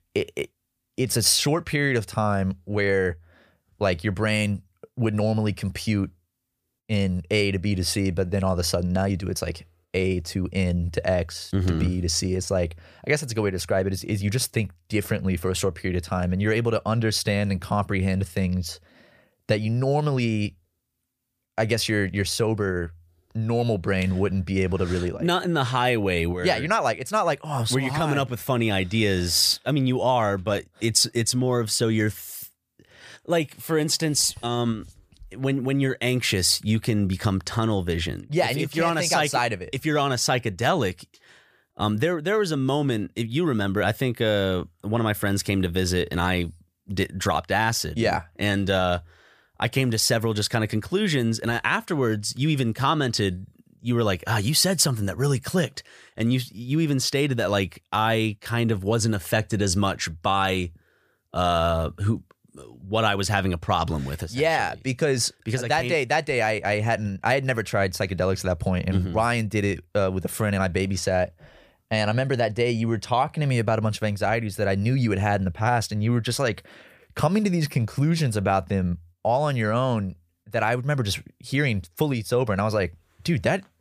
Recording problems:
none

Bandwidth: 15 kHz